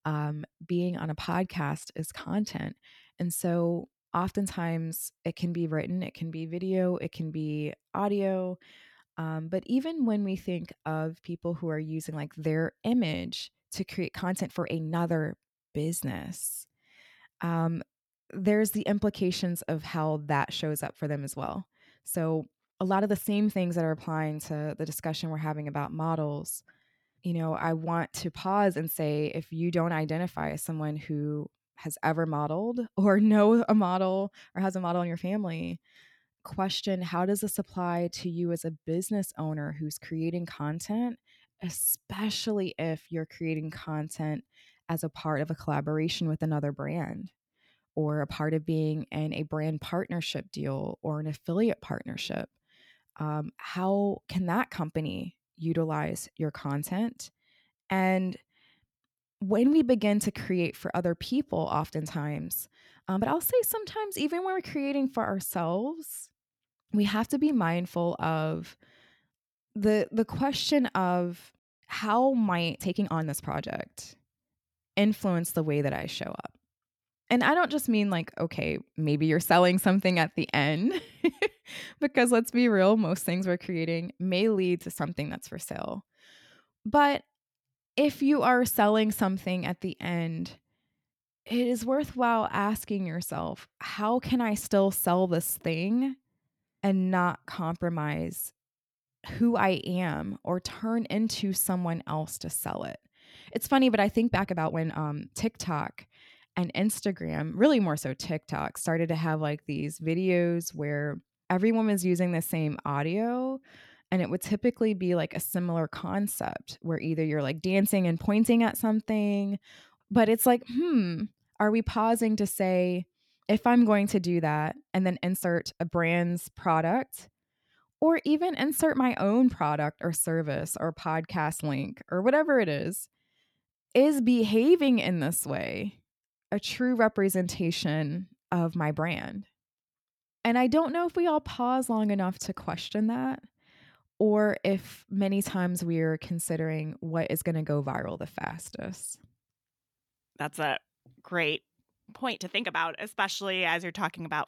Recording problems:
uneven, jittery; strongly; from 14 s to 2:33

